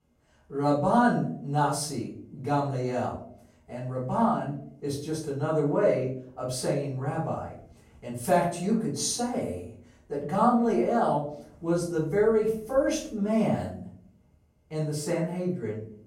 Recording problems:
off-mic speech; far
room echo; noticeable; dies away in 0.4 s

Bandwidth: 16 kHz